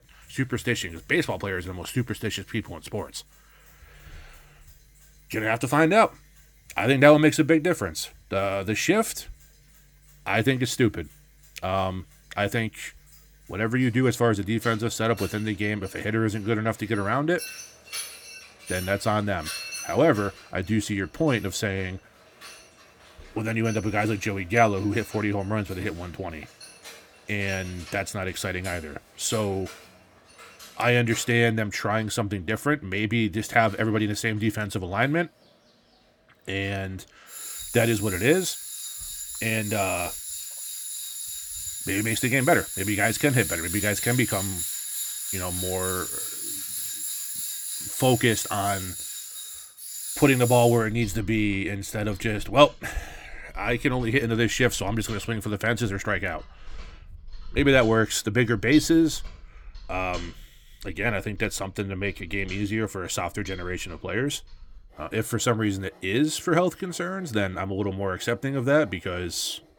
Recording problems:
machinery noise; loud; throughout; 8 dB below the speech

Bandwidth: 18 kHz